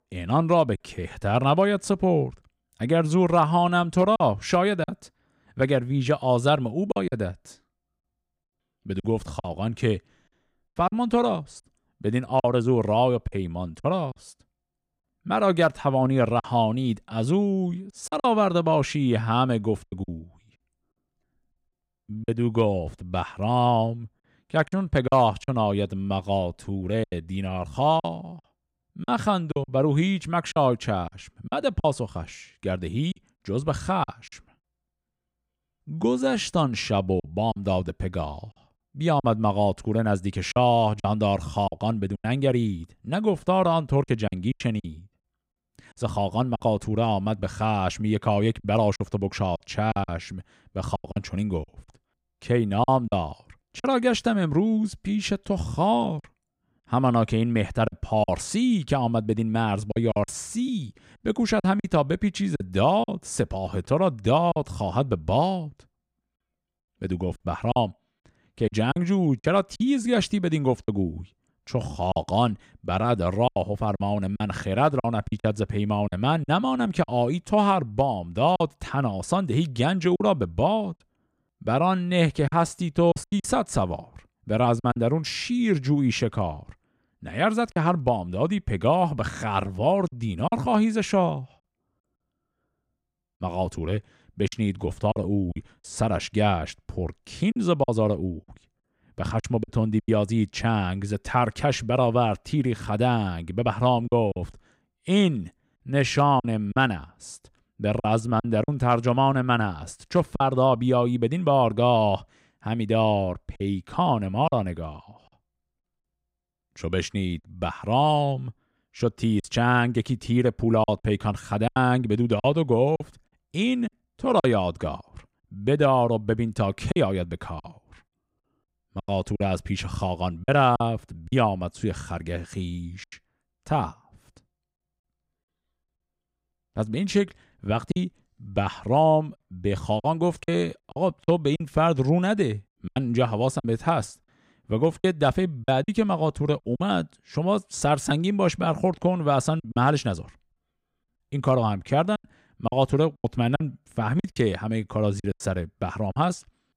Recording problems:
choppy; very; 6% of the speech affected

